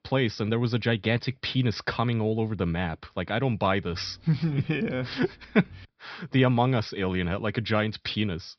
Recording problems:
high frequencies cut off; noticeable; nothing above 5.5 kHz

